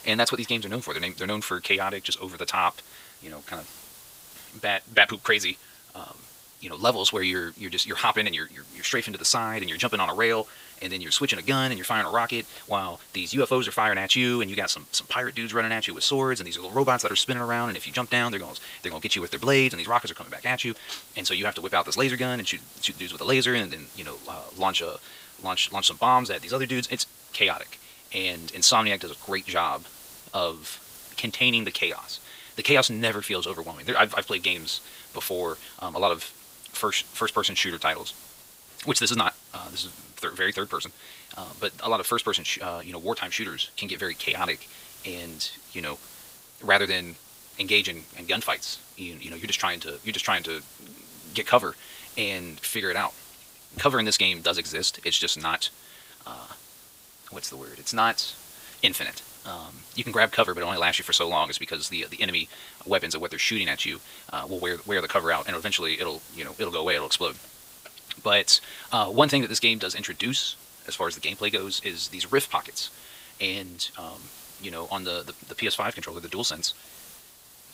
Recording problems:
wrong speed, natural pitch; too fast; 1.5 times normal speed
thin; somewhat; fading below 1 kHz
hiss; faint; throughout; 20 dB below the speech

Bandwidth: 15.5 kHz